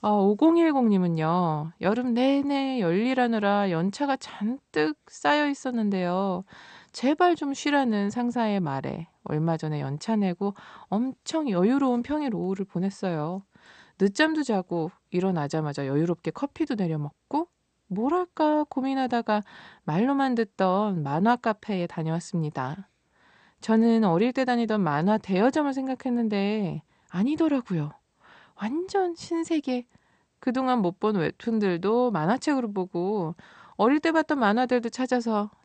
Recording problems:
garbled, watery; slightly; nothing above 8 kHz

